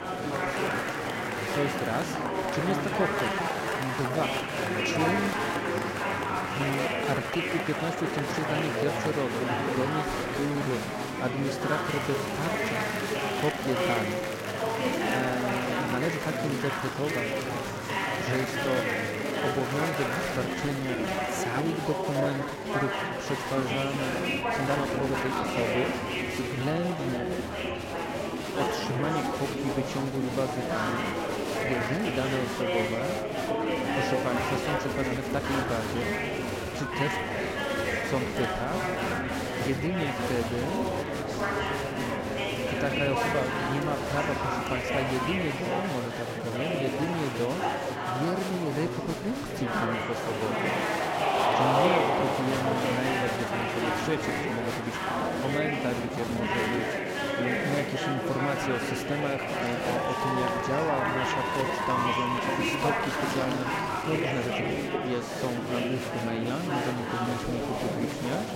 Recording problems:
murmuring crowd; very loud; throughout; 4 dB above the speech
crackling; noticeable; from 0.5 to 2 s and at 34 s; 20 dB below the speech
uneven, jittery; strongly; from 3 s to 1:05

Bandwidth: 16 kHz